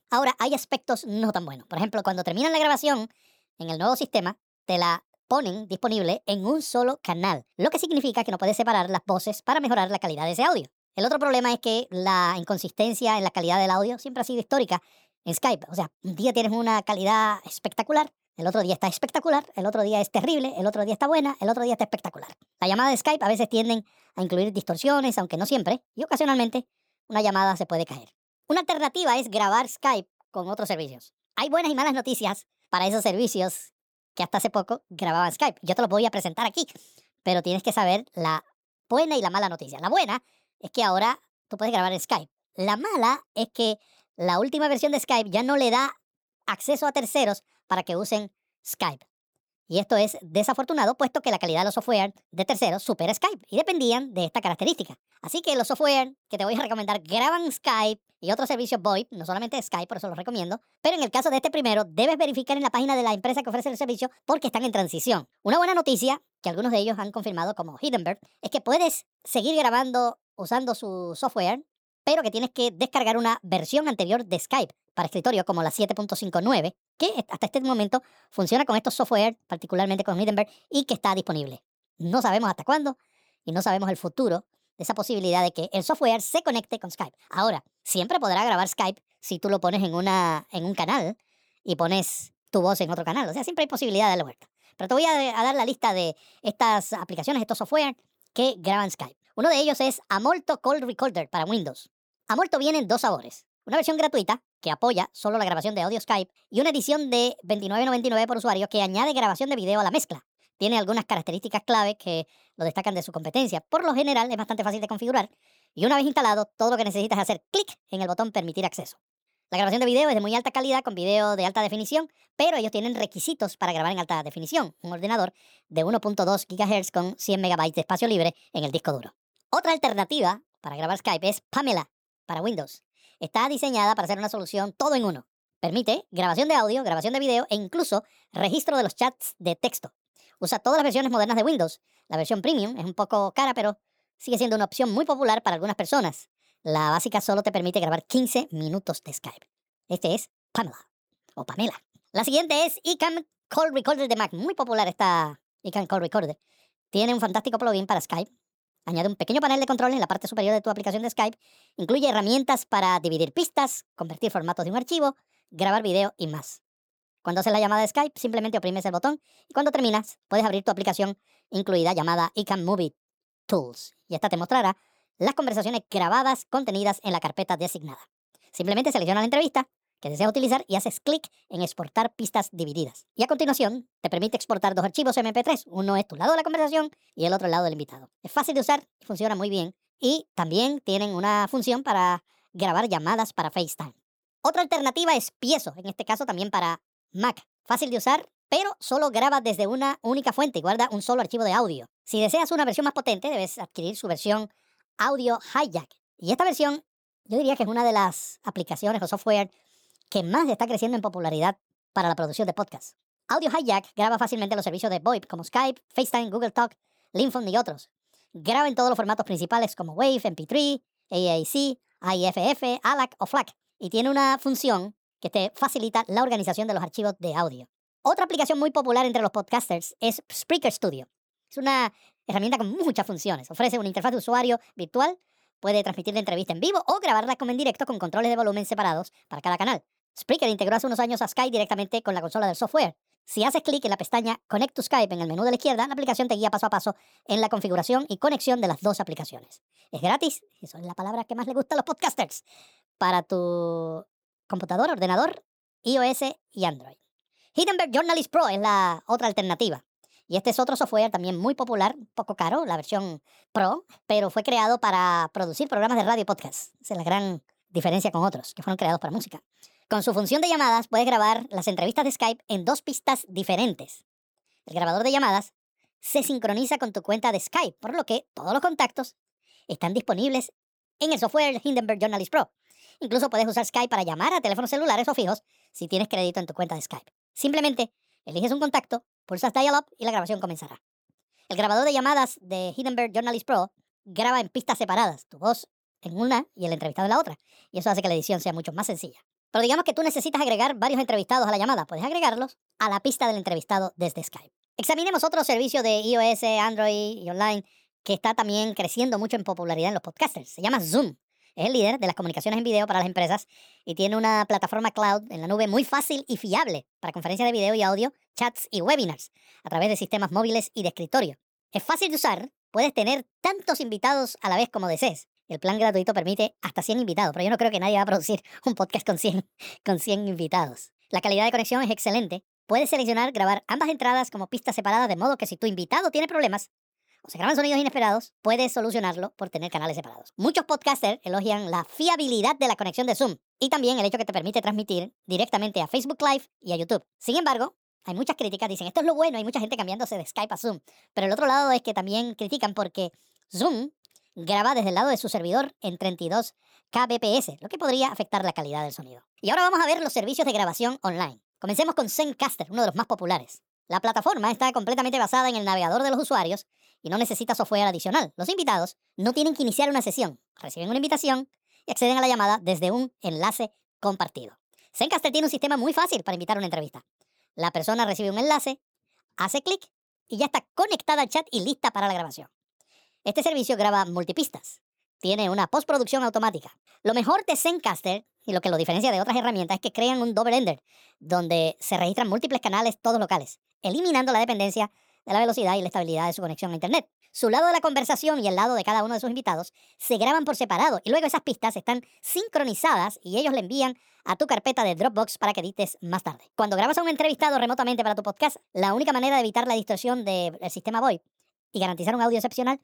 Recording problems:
wrong speed and pitch; too fast and too high; 1.5 times normal speed

